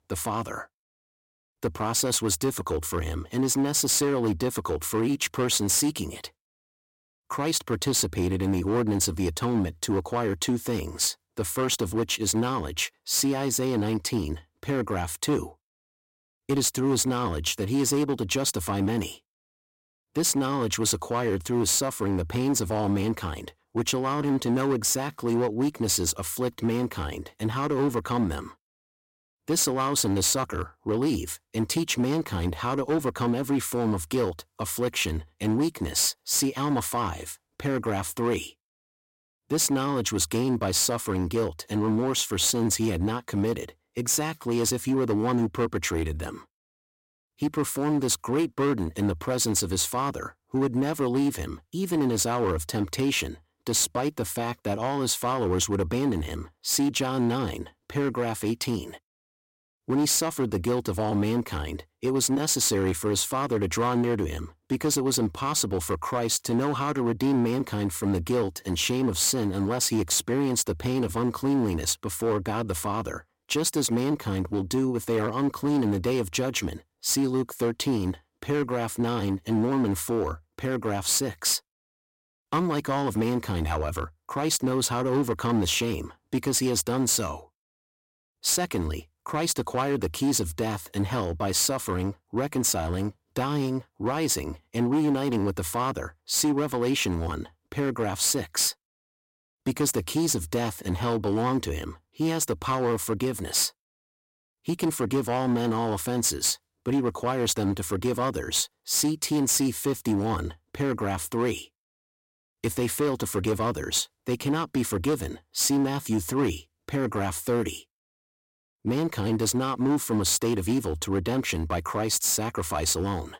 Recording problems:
distortion; slight; 8% of the sound clipped

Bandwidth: 16.5 kHz